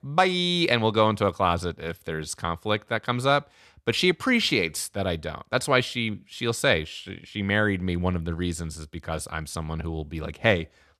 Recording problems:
none

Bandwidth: 13.5 kHz